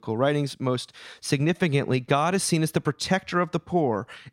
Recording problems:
none

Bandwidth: 16 kHz